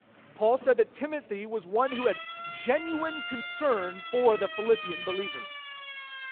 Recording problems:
phone-call audio
traffic noise; faint; throughout; 25 dB below the speech
siren; noticeable; from 2 s on; peak 5 dB below the speech

